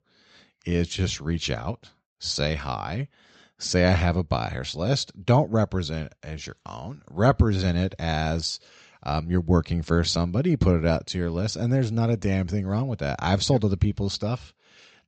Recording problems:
high frequencies cut off; noticeable; nothing above 8 kHz

